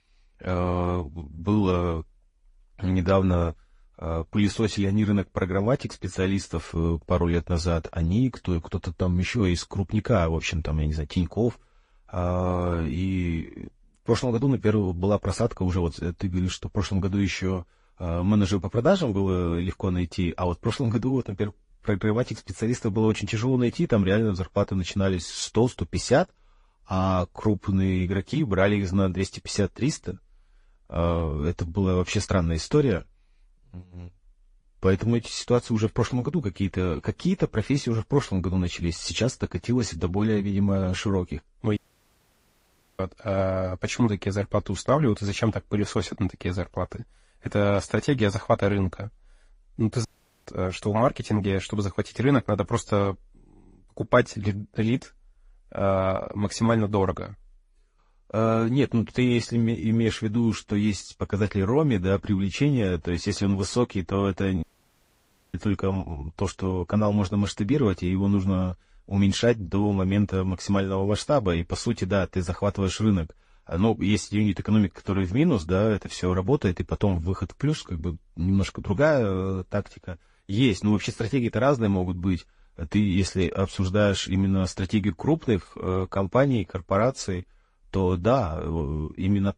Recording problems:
garbled, watery; slightly; nothing above 10.5 kHz
audio cutting out; at 42 s for 1 s, at 50 s and at 1:05 for 1 s

